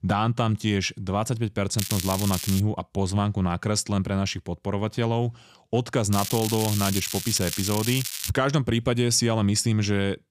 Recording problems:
crackling; loud; at 2 s and from 6 to 8.5 s; 5 dB below the speech

